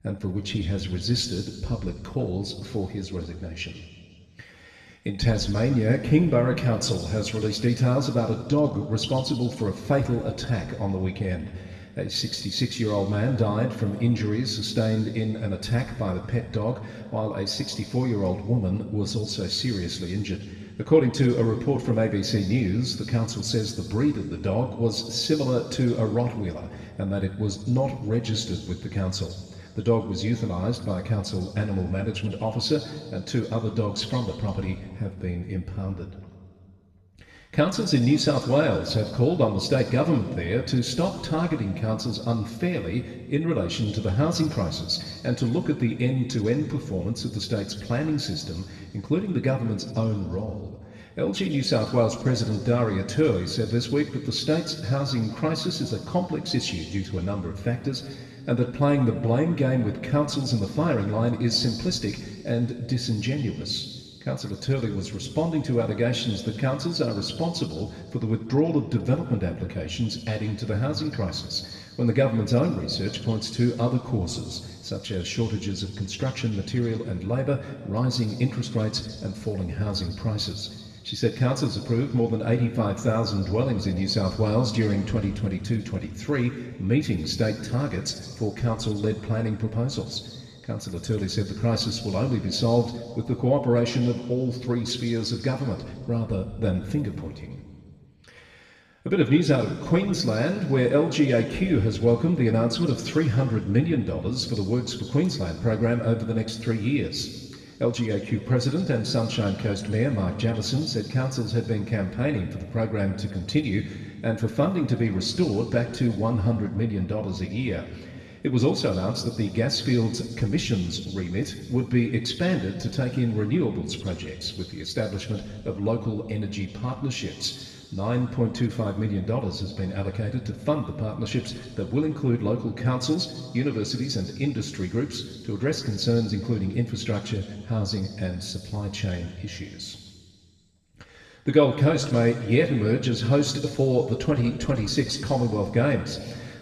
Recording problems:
room echo; noticeable; dies away in 1.7 s
off-mic speech; somewhat distant

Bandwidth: 13.5 kHz